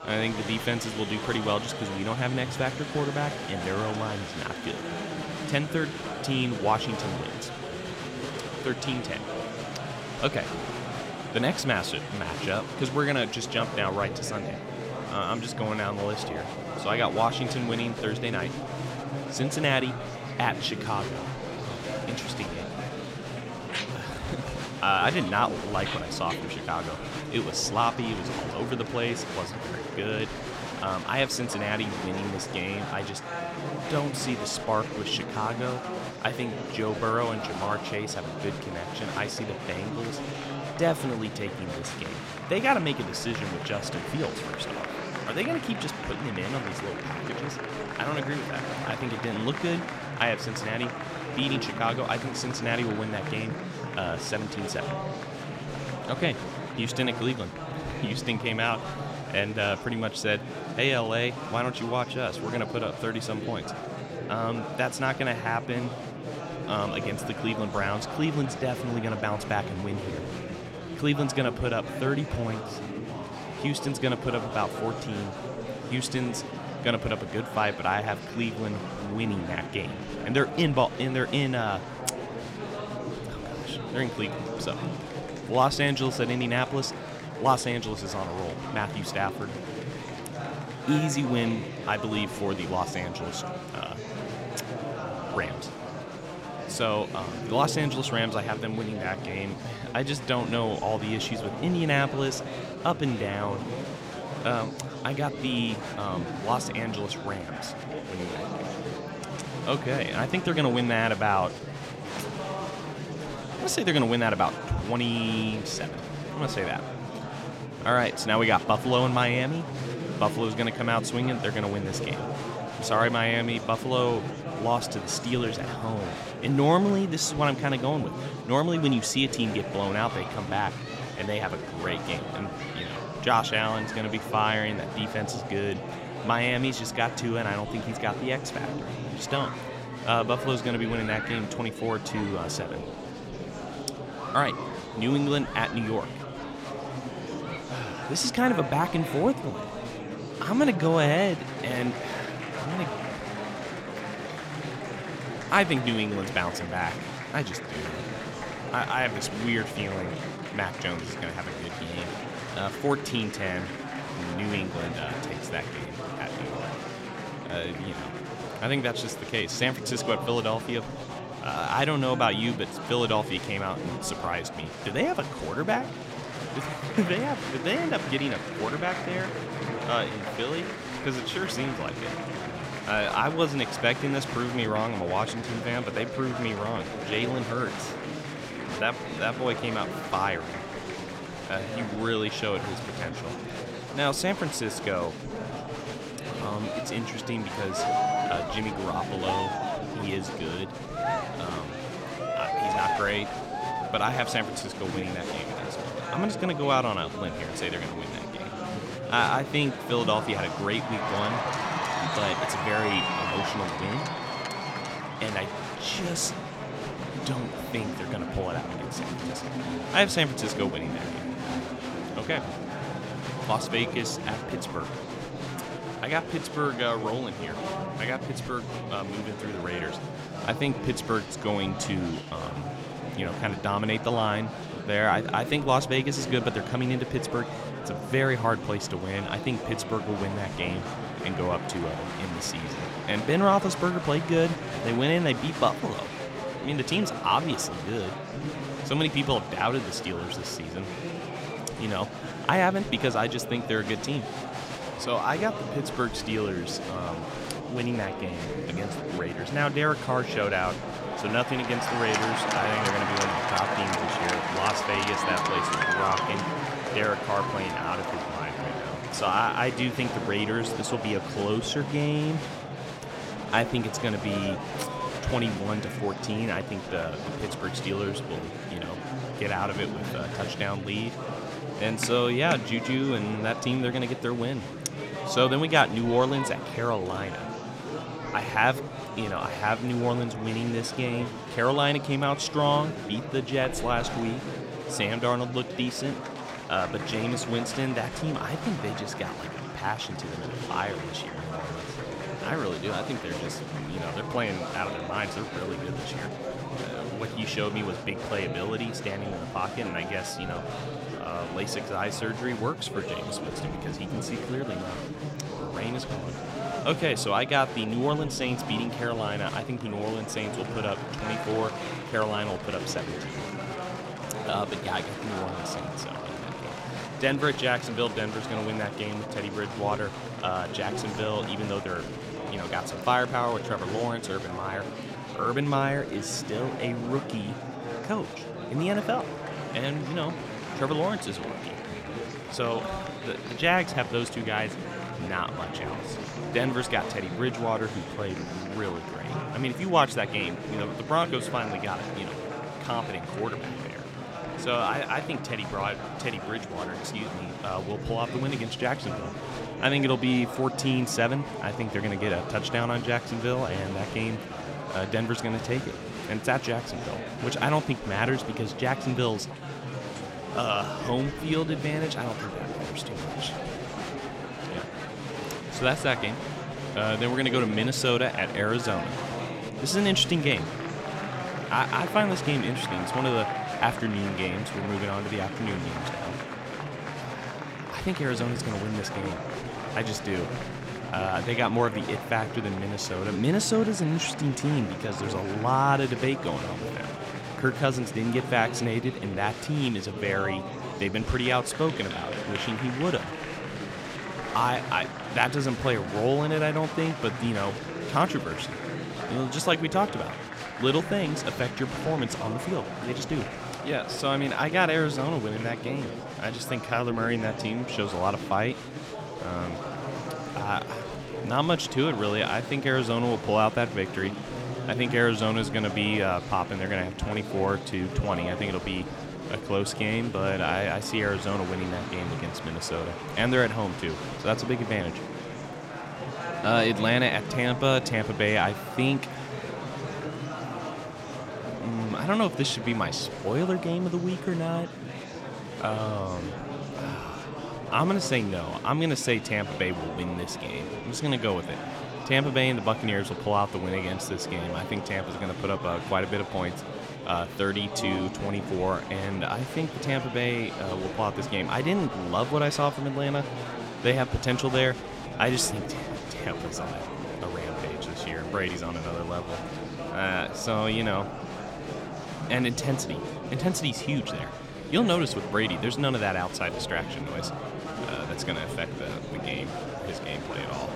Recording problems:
murmuring crowd; loud; throughout; 6 dB below the speech

